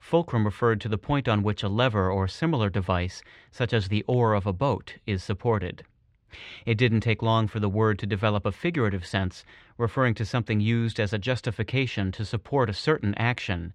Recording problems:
muffled; slightly; fading above 3 kHz

